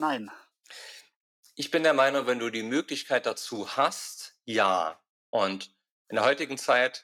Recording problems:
thin; somewhat; fading below 450 Hz
abrupt cut into speech; at the start

